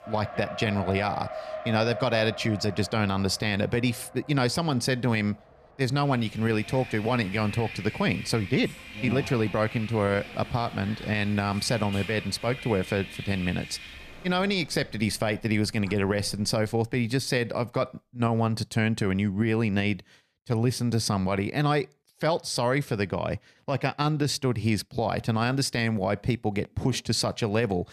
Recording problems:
traffic noise; noticeable; until 16 s; 15 dB below the speech

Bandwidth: 14.5 kHz